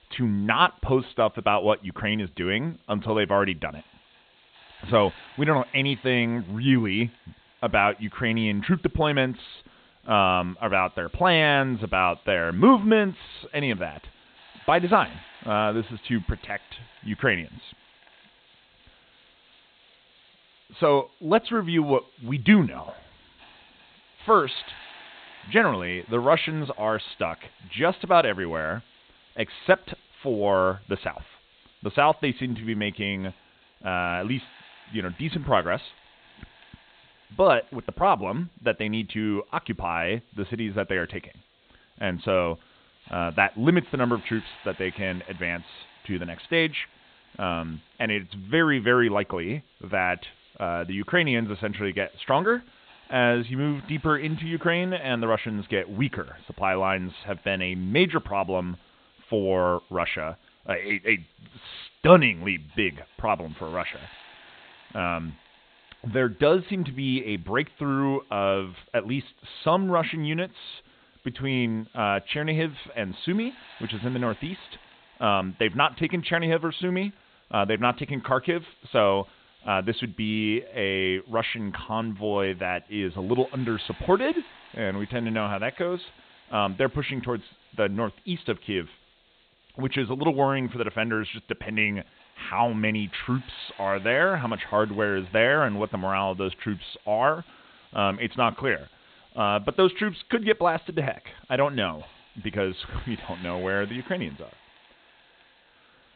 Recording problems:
high frequencies cut off; severe; nothing above 4 kHz
hiss; faint; throughout; 25 dB below the speech

